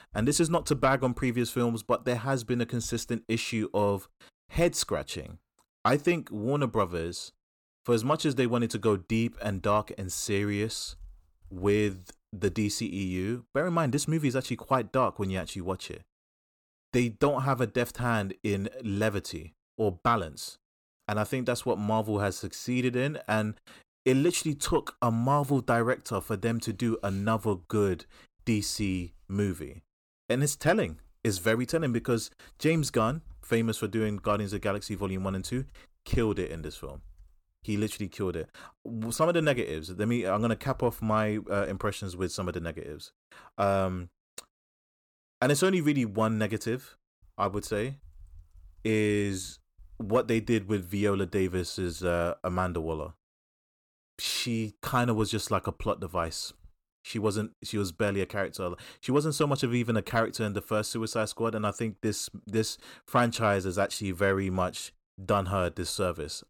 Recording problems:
none

